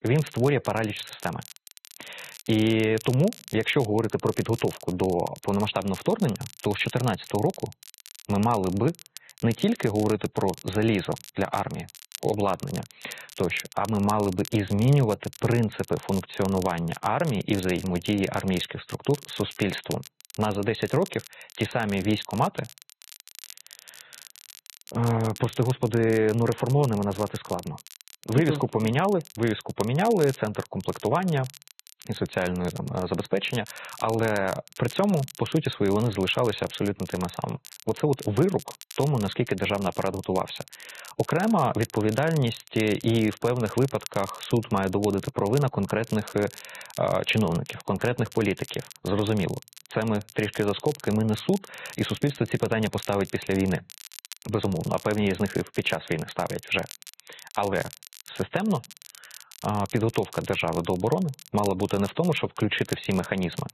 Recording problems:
garbled, watery; badly; nothing above 4 kHz
muffled; very slightly; fading above 4 kHz
crackle, like an old record; noticeable; 20 dB below the speech

